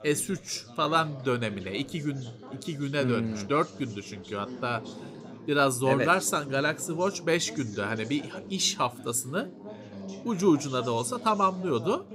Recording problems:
background chatter; noticeable; throughout; 3 voices, 15 dB below the speech

